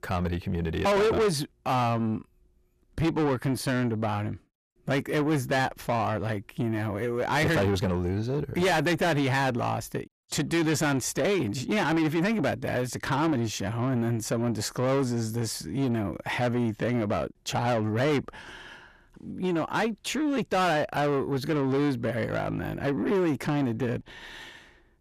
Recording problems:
distortion; heavy; 6 dB below the speech

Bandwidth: 14.5 kHz